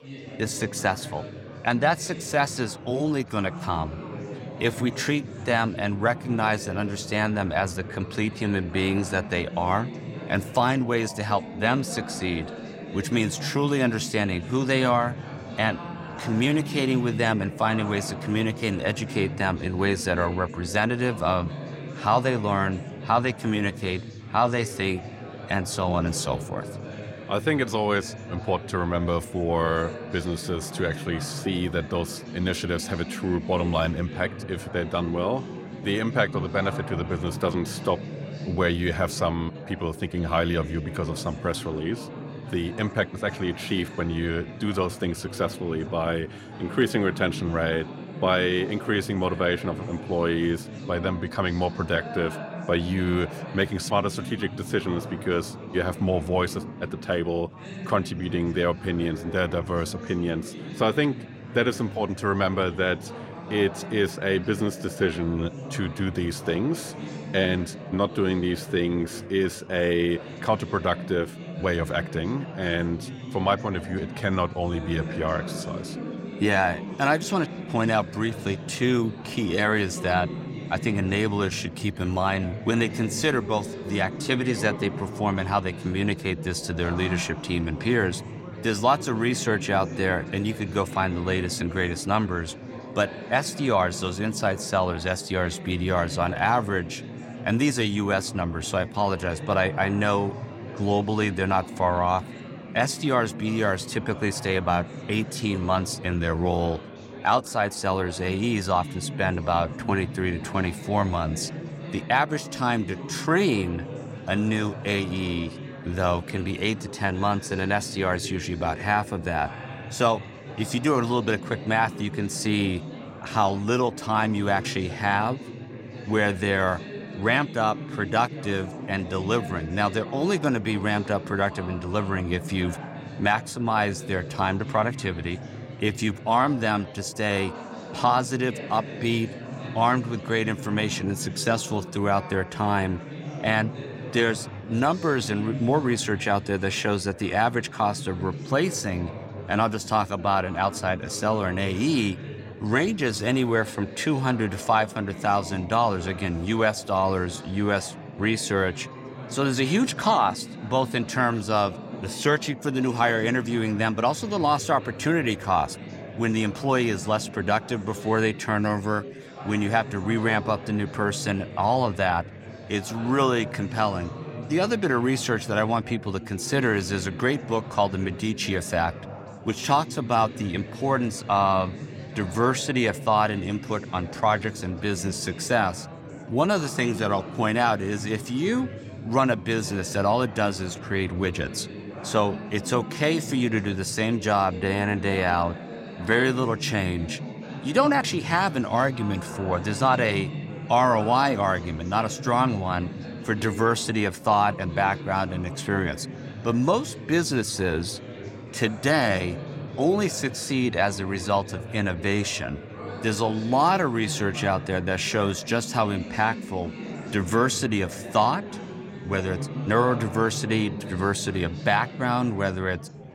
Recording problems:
chatter from many people; noticeable; throughout; 10 dB below the speech

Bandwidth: 16 kHz